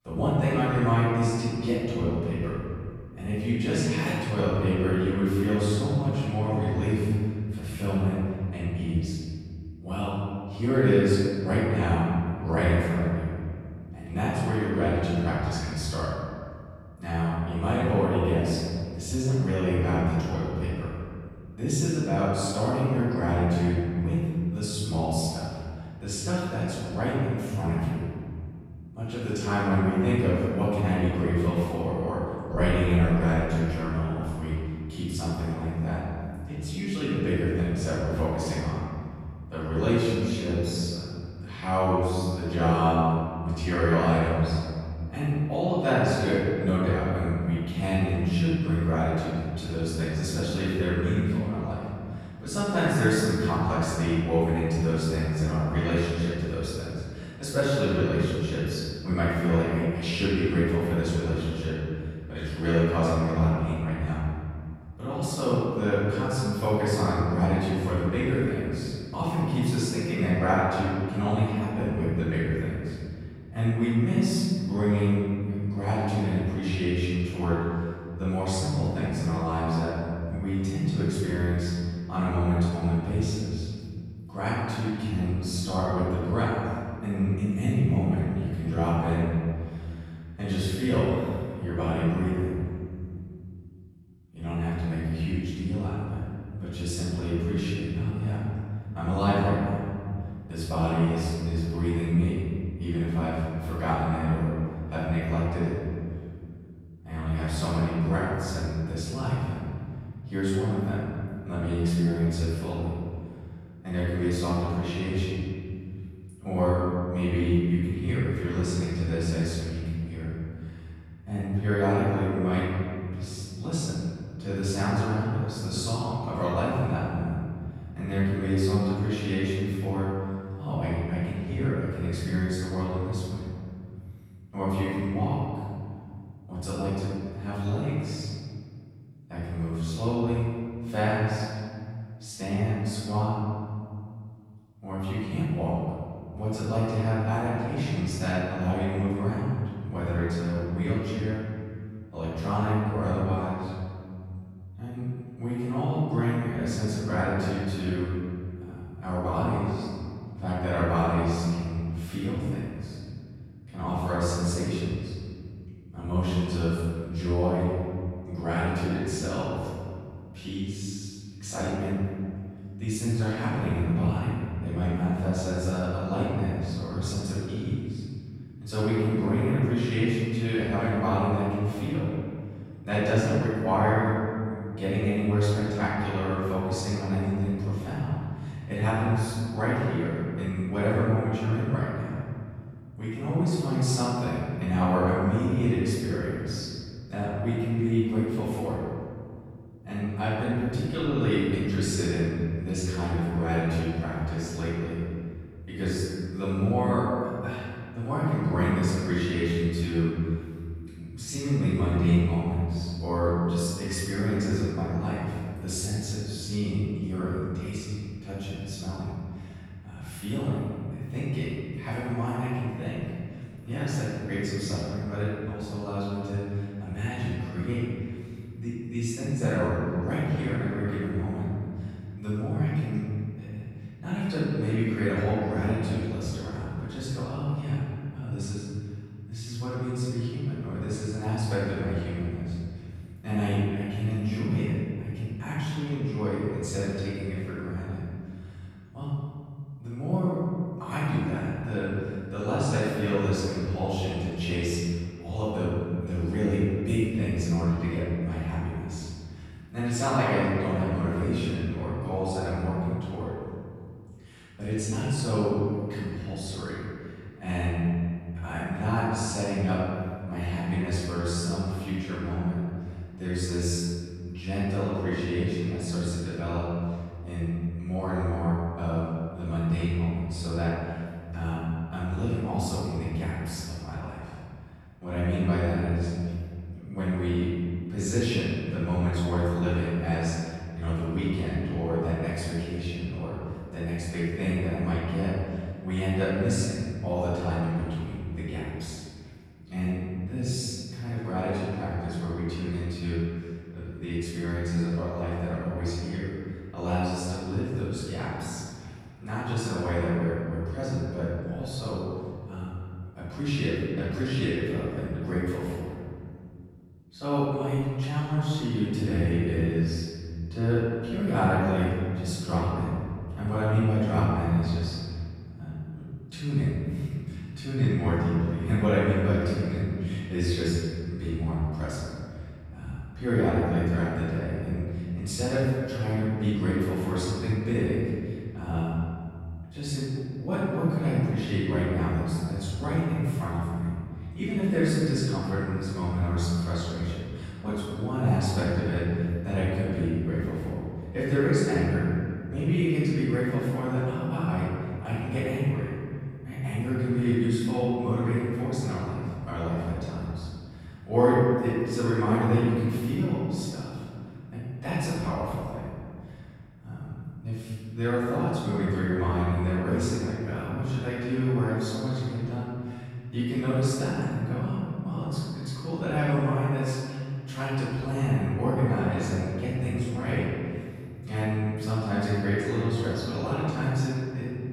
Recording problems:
room echo; strong; dies away in 2.4 s
off-mic speech; far

